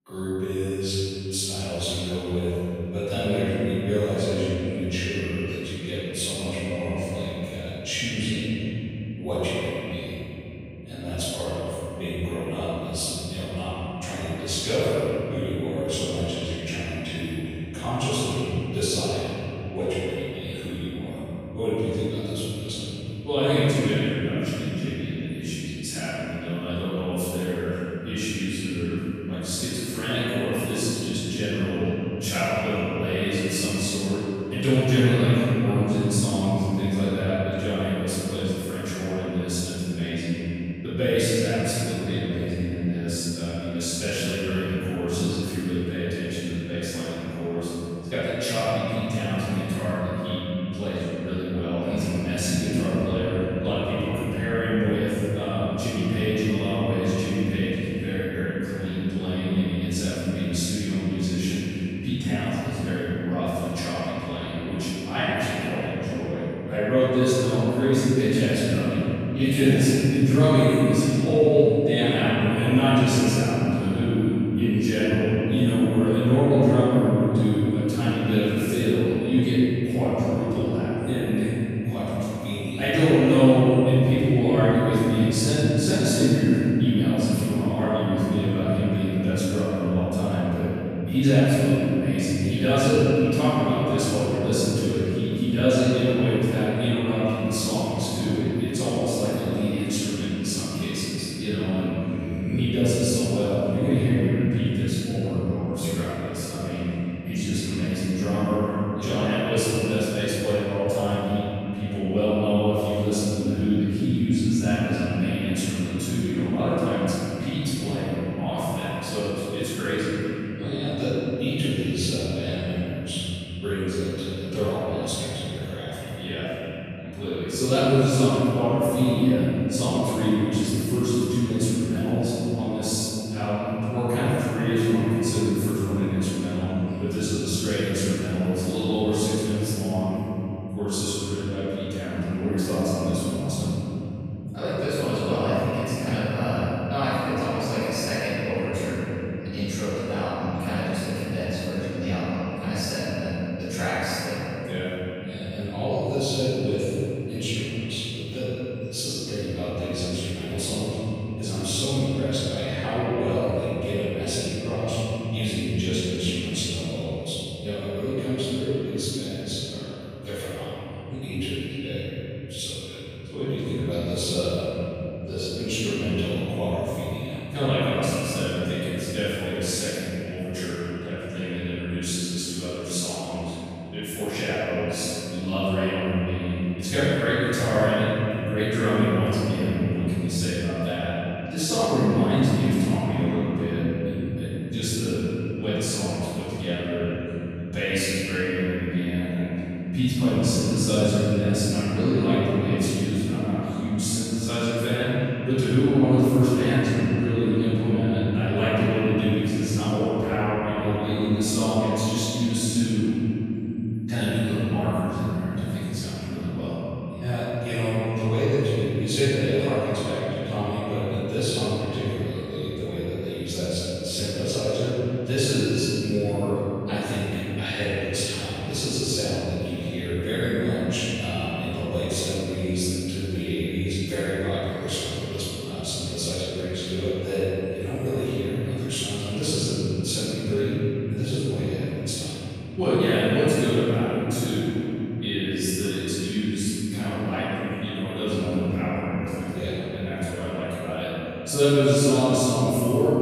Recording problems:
room echo; strong; dies away in 3 s
off-mic speech; far
echo of what is said; noticeable; throughout; 90 ms later, 15 dB below the speech

